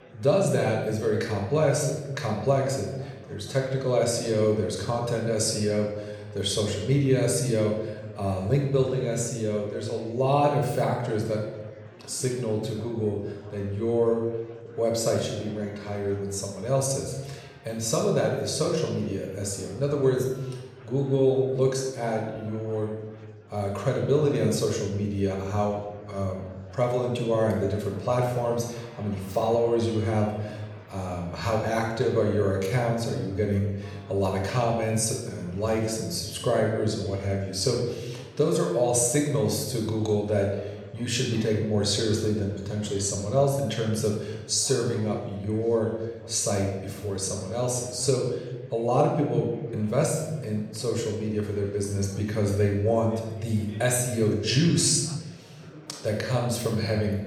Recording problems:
room echo; noticeable; dies away in 1.1 s
off-mic speech; somewhat distant
murmuring crowd; faint; throughout; 25 dB below the speech

